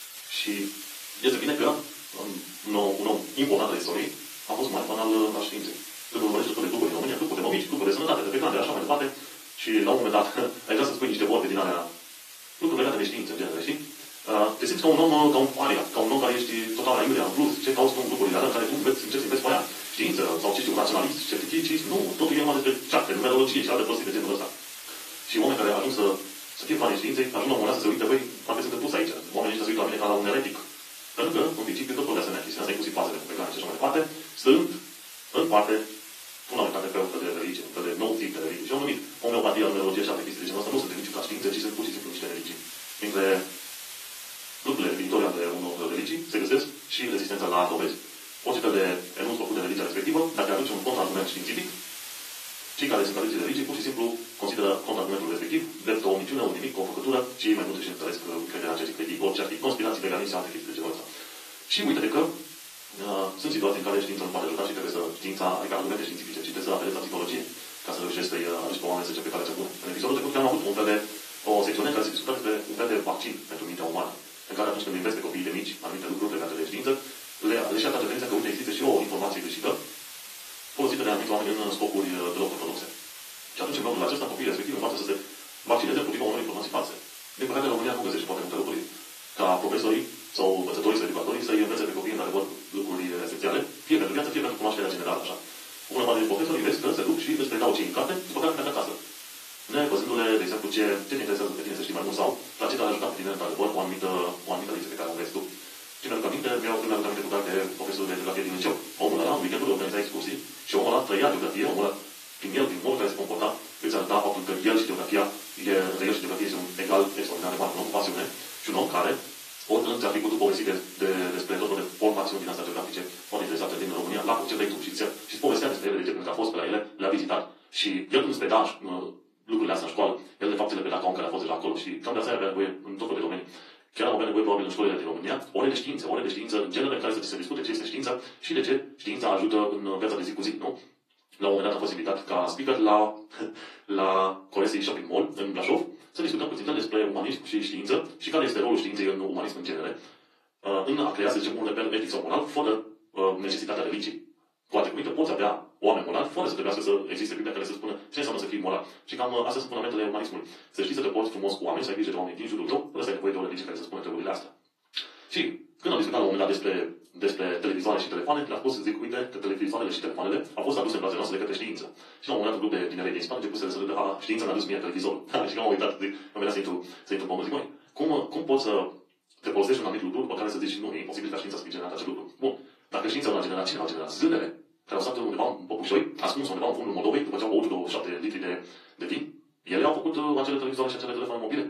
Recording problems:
off-mic speech; far
wrong speed, natural pitch; too fast; 1.7 times normal speed
thin; somewhat; fading below 300 Hz
room echo; very slight; dies away in 0.3 s
garbled, watery; slightly; nothing above 13.5 kHz
hiss; noticeable; until 2:06; 10 dB below the speech

